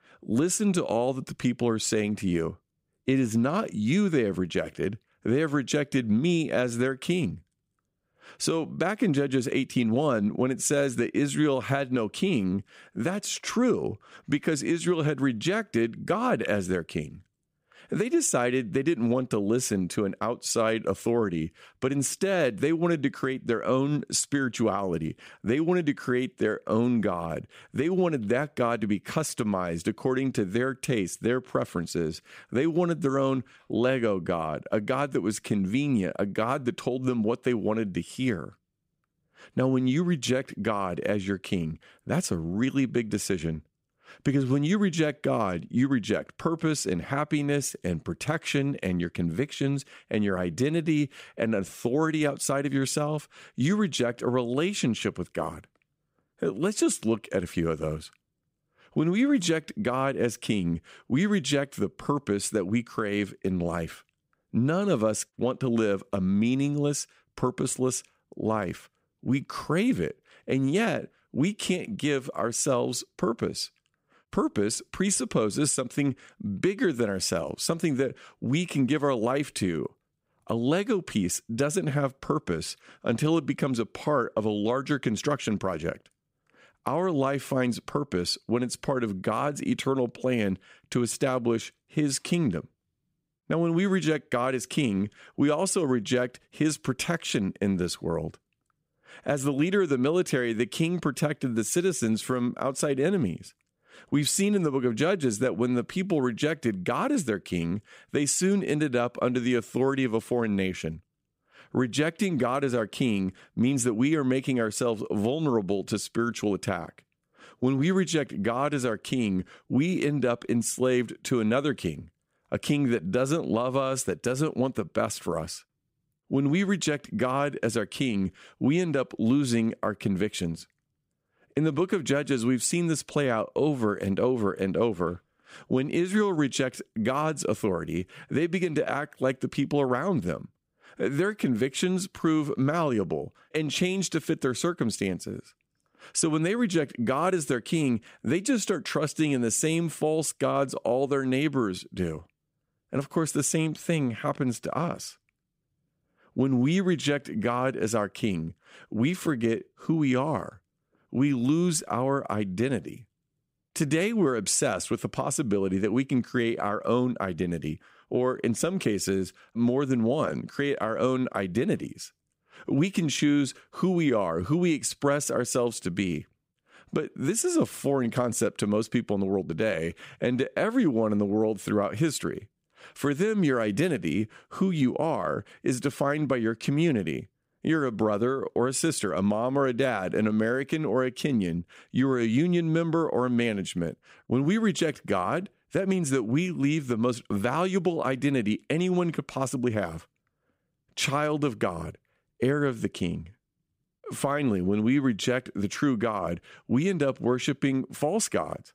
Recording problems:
none

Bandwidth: 15.5 kHz